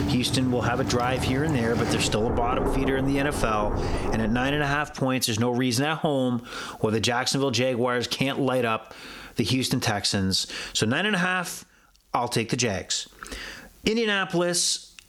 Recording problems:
squashed, flat; somewhat, background pumping
rain or running water; loud; until 4.5 s; 5 dB below the speech

